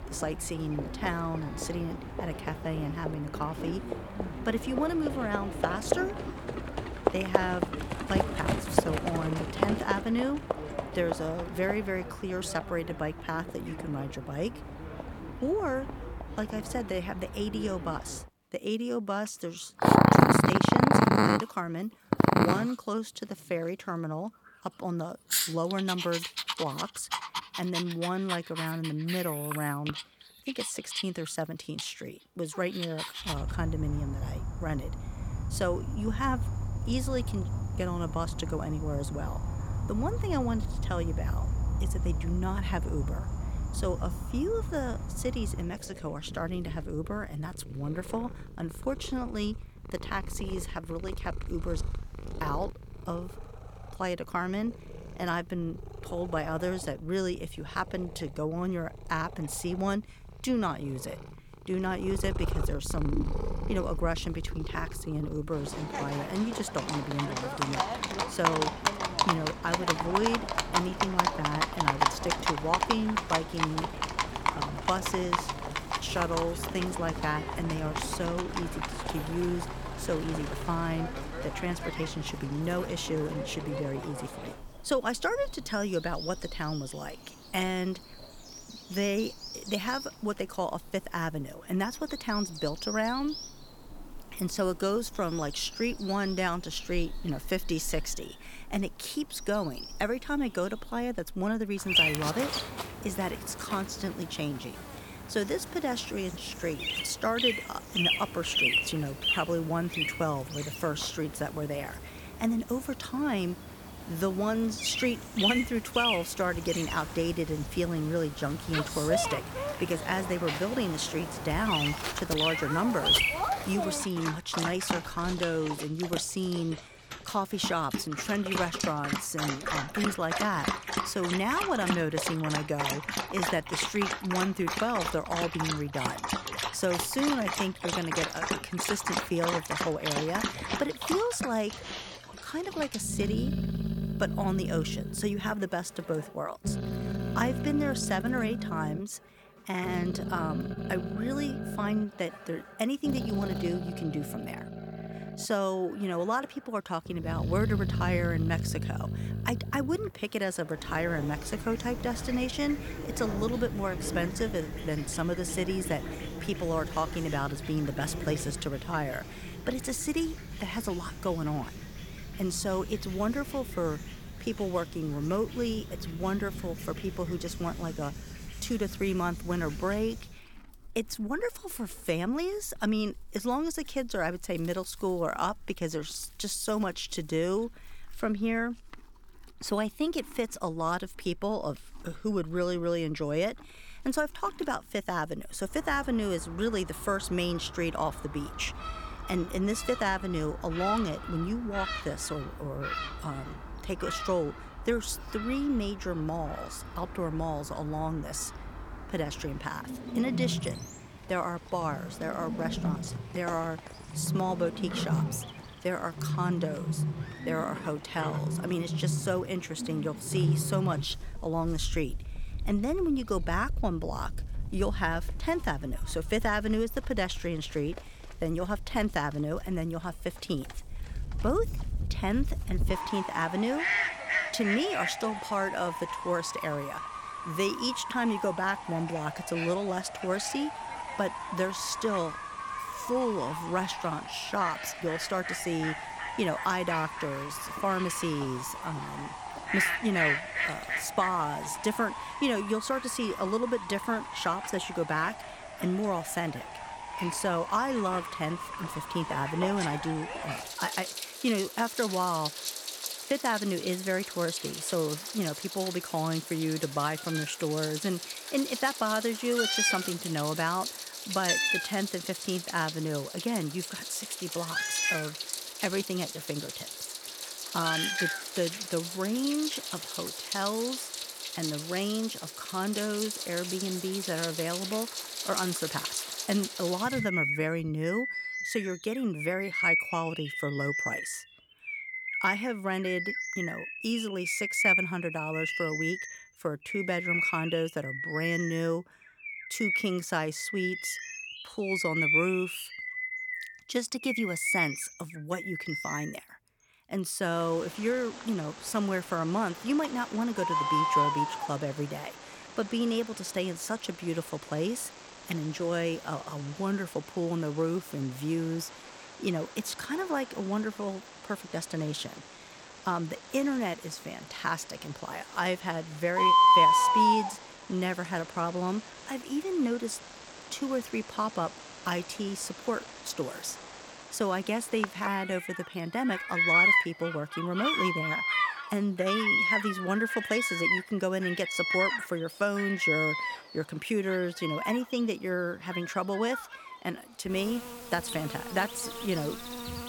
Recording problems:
animal sounds; loud; throughout; as loud as the speech

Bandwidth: 18.5 kHz